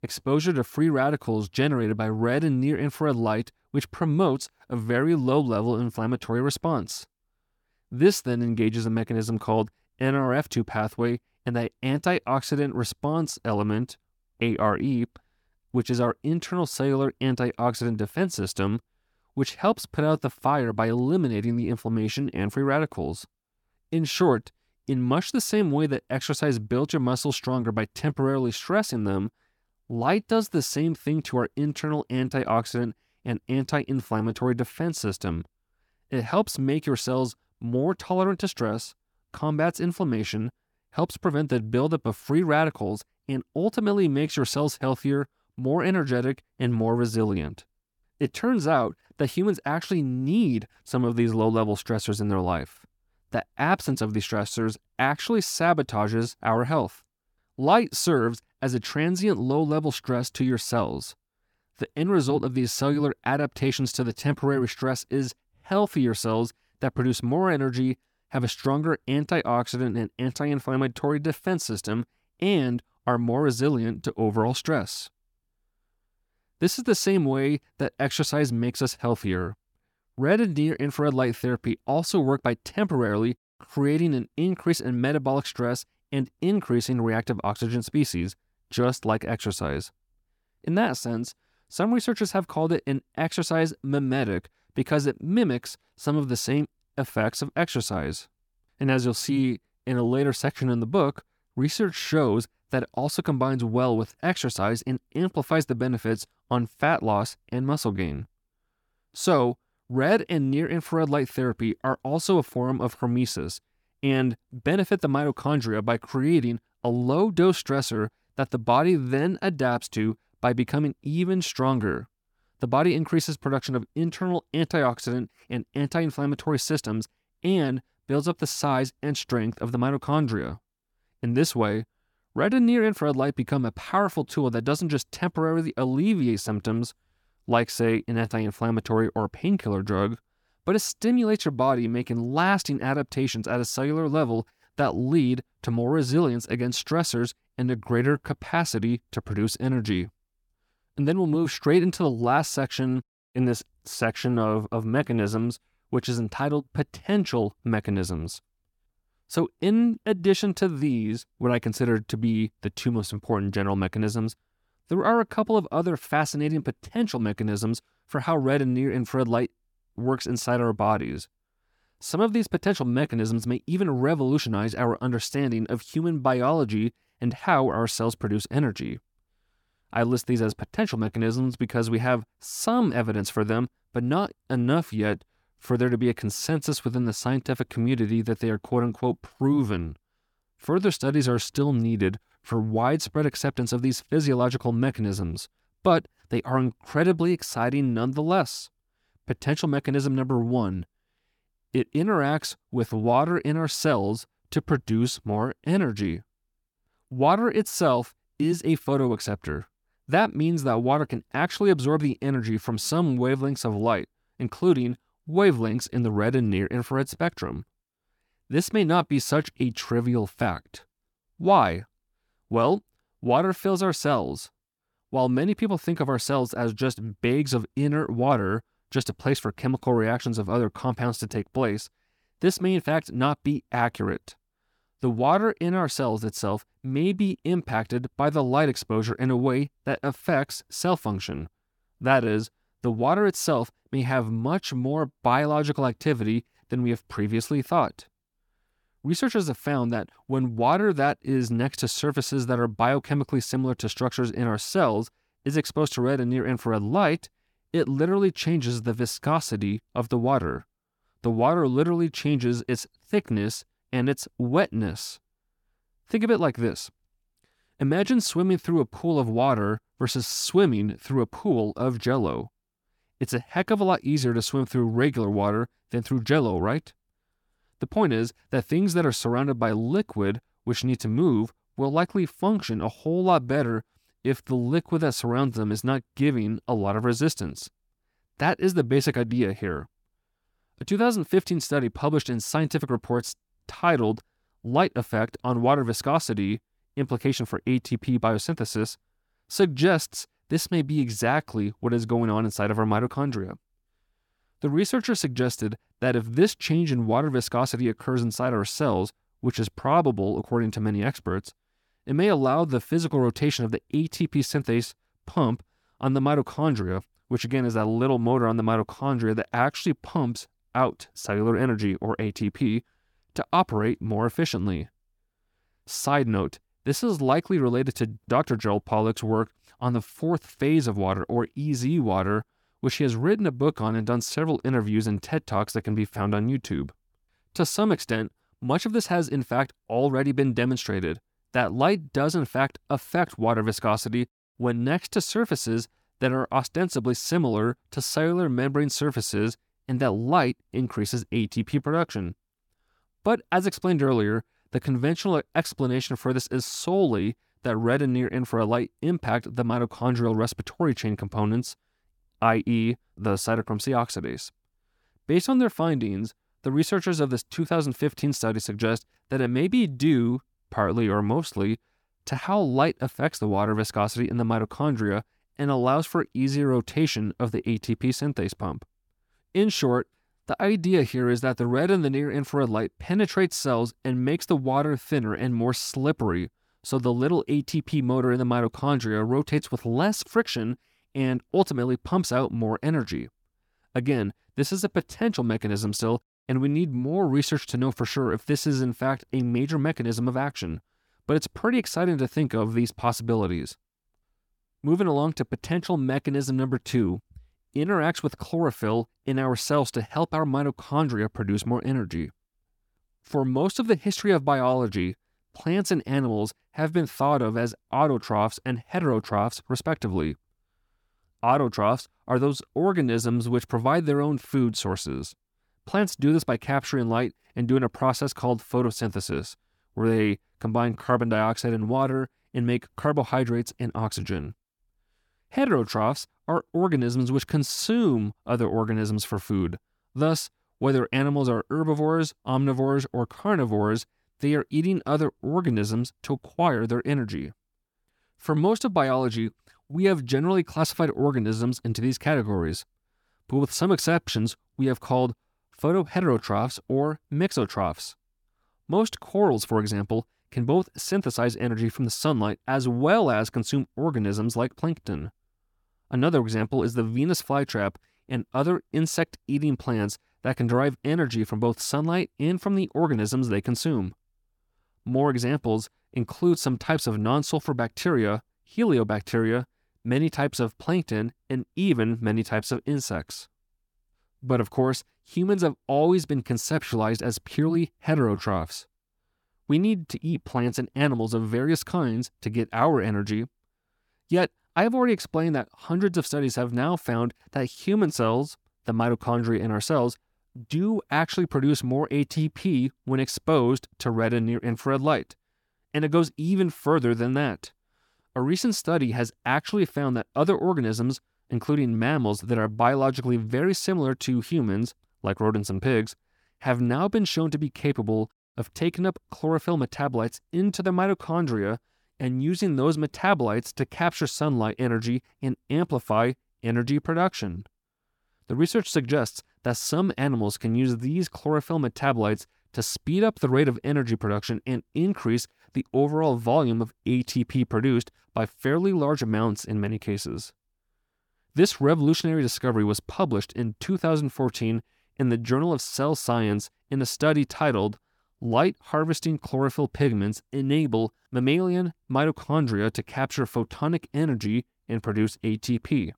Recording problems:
none

